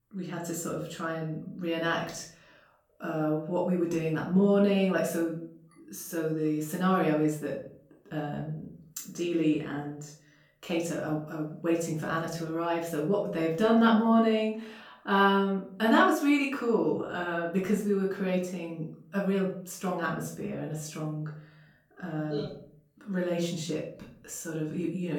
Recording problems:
off-mic speech; far
room echo; slight; dies away in 0.5 s
abrupt cut into speech; at the end

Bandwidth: 17.5 kHz